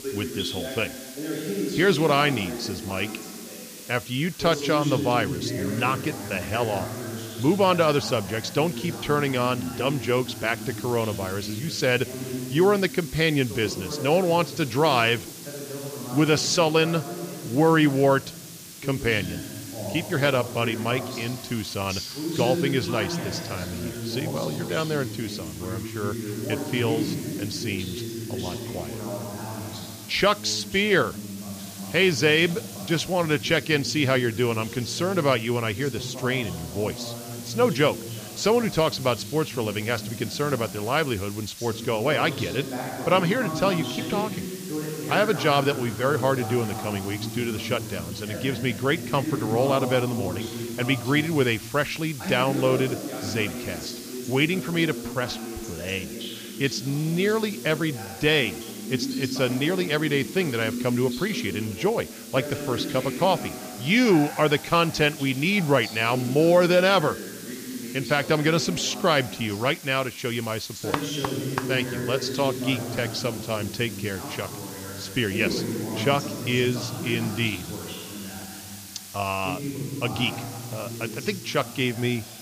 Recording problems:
voice in the background; loud; throughout; 9 dB below the speech
hiss; noticeable; throughout; 15 dB below the speech

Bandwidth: 15 kHz